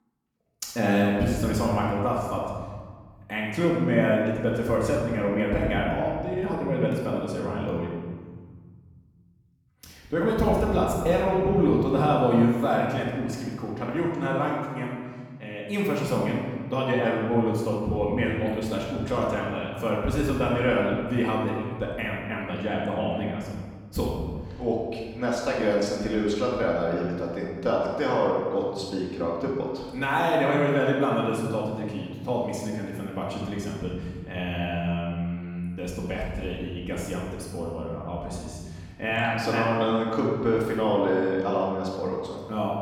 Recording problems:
off-mic speech; far
room echo; noticeable; dies away in 1.6 s

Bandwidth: 18.5 kHz